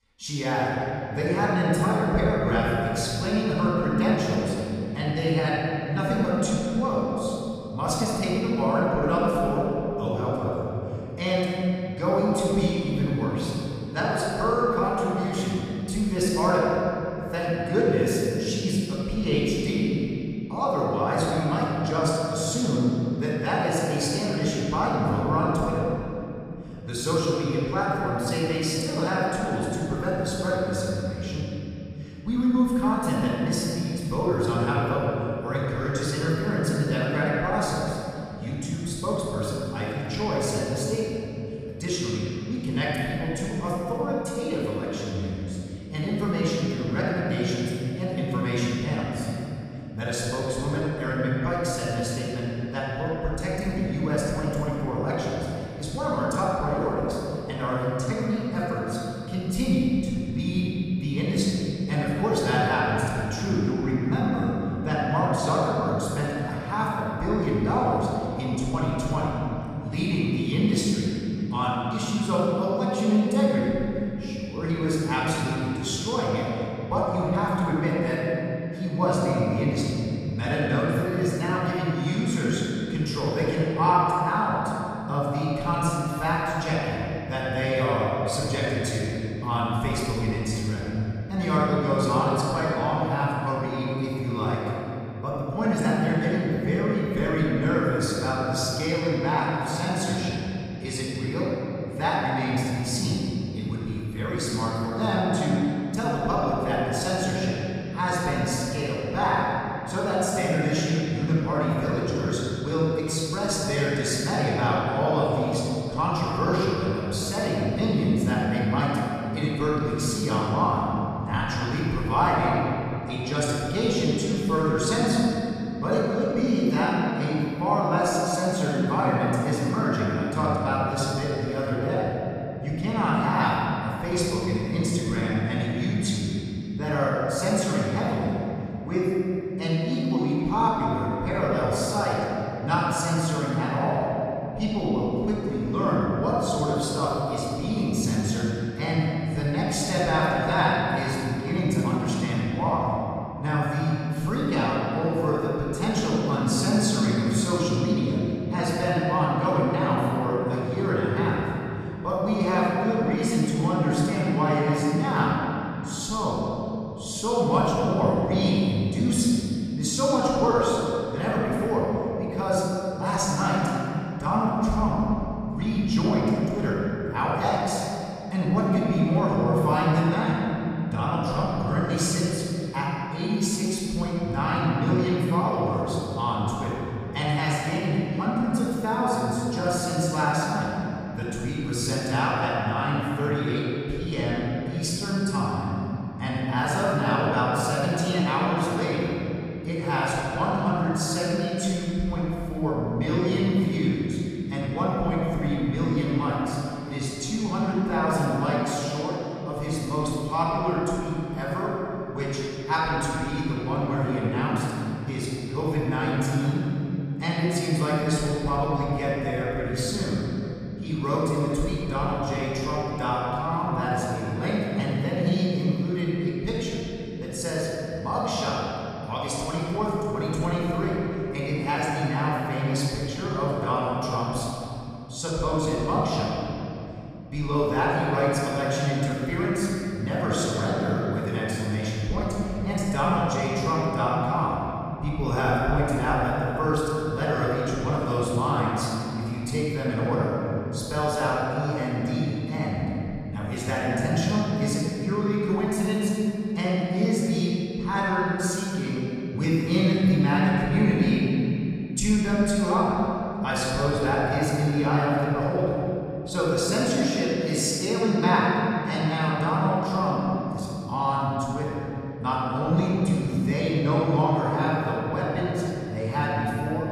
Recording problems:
room echo; strong; dies away in 3 s
off-mic speech; far

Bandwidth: 14.5 kHz